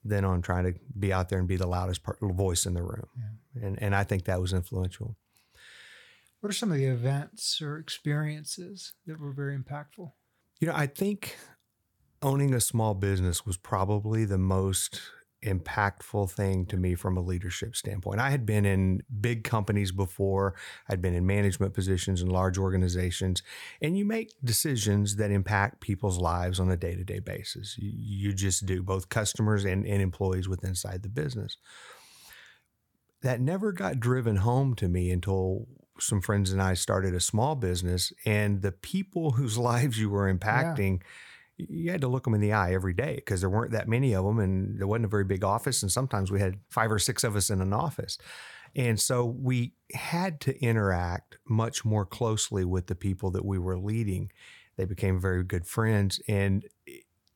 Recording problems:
none

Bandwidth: 18 kHz